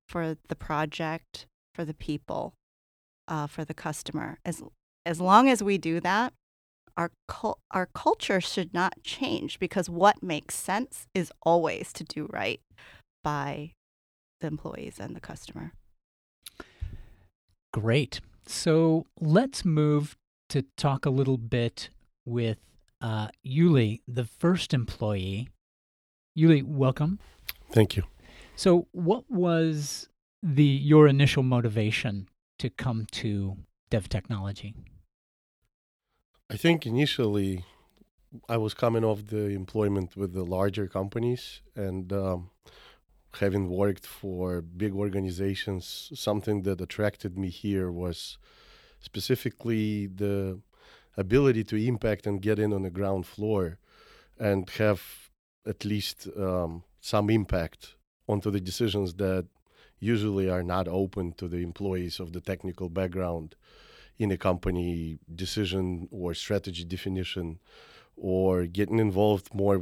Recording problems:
abrupt cut into speech; at the end

